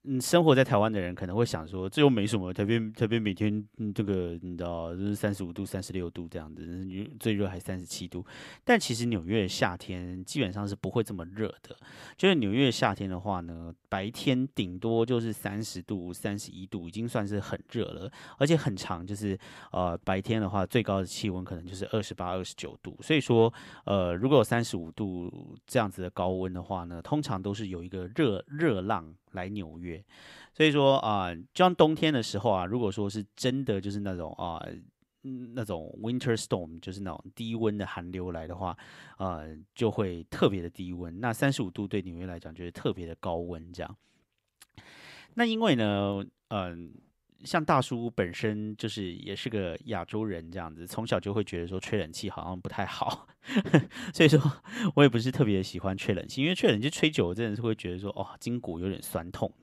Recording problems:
none

